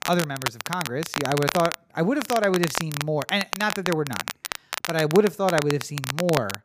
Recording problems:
crackle, like an old record; loud; 6 dB below the speech

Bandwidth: 15 kHz